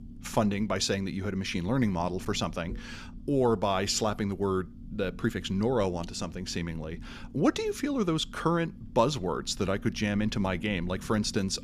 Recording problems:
low rumble; faint; throughout; 25 dB below the speech

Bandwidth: 14.5 kHz